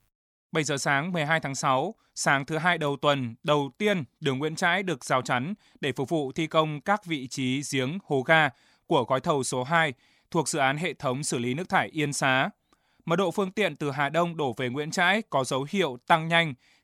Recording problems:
none

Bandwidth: 18.5 kHz